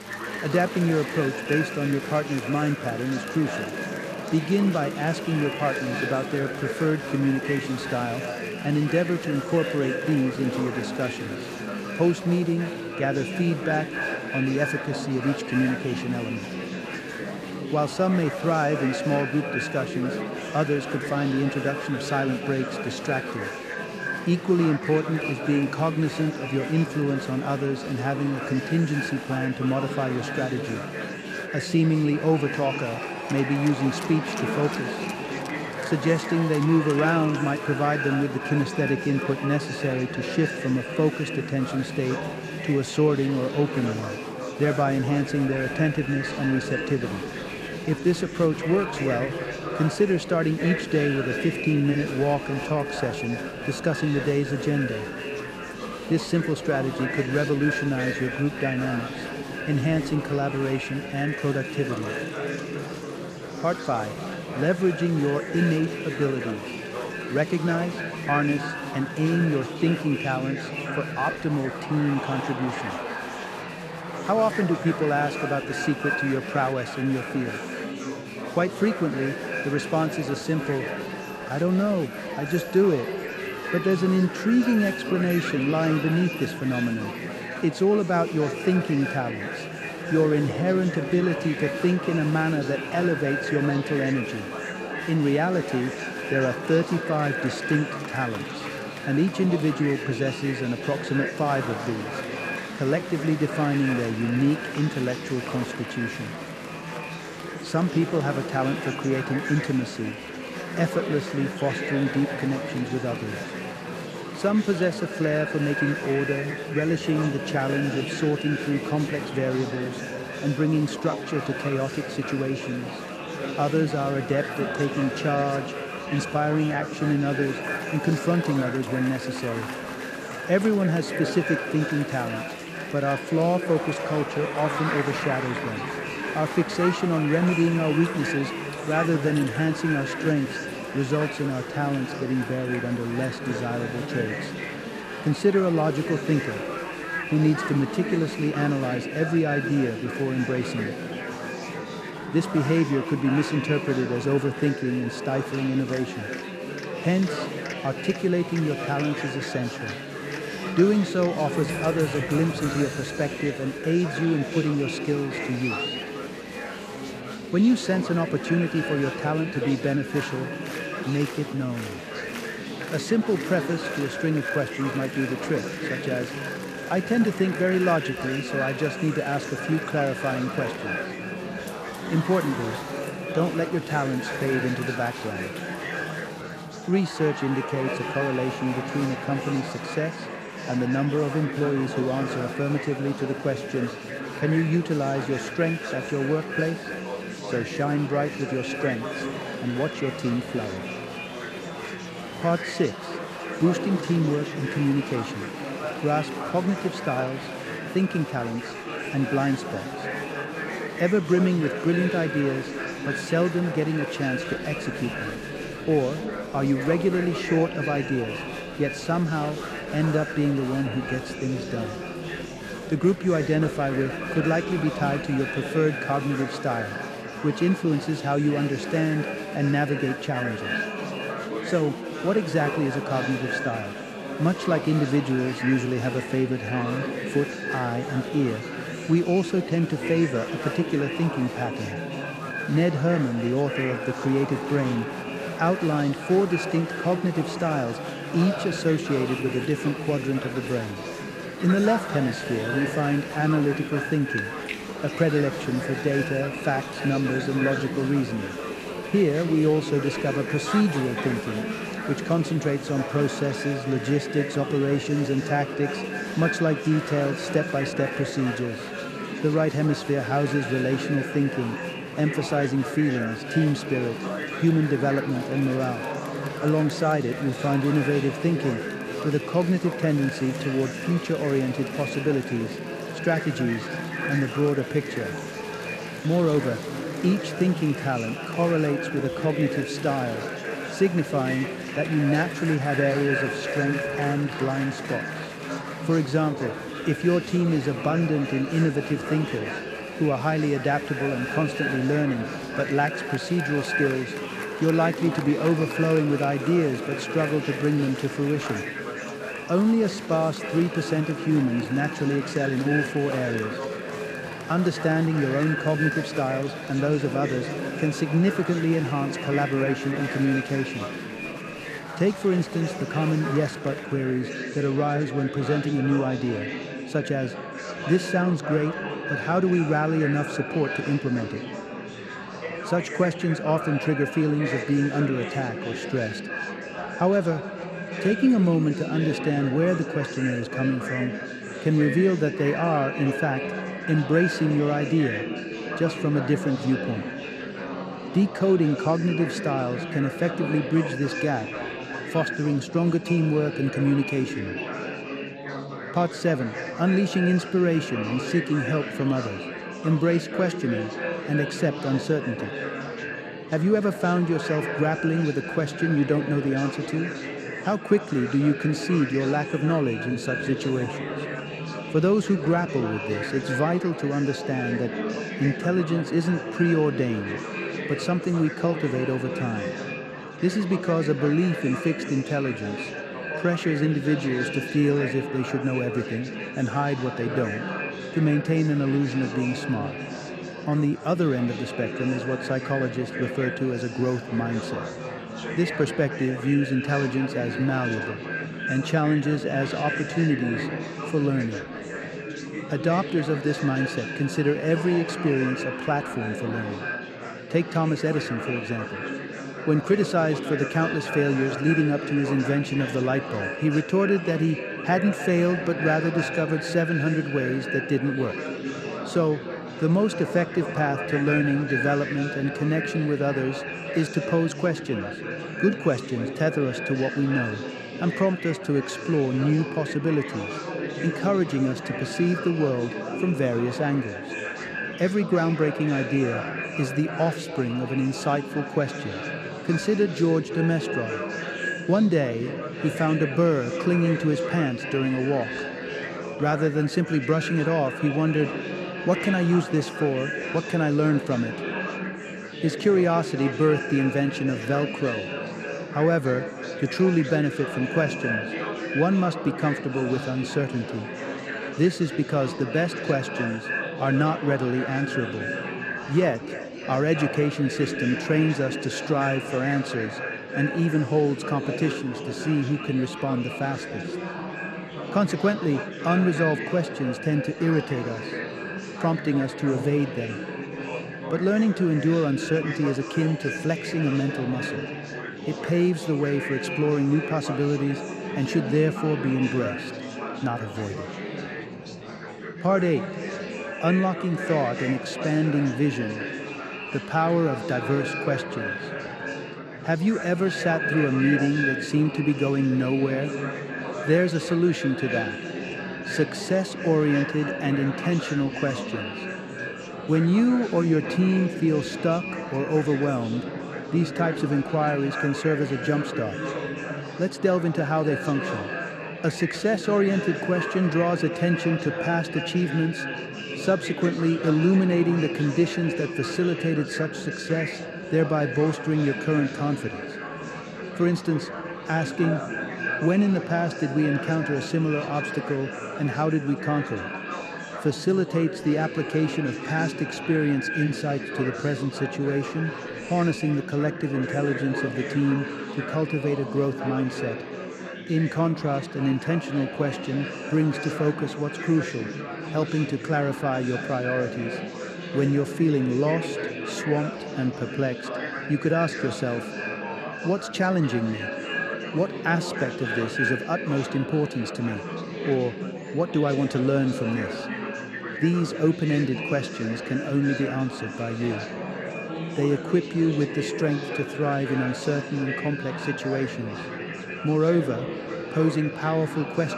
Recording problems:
echo of what is said; strong; throughout; 300 ms later, 9 dB below the speech
chatter from many people; loud; throughout; 8 dB below the speech

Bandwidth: 14.5 kHz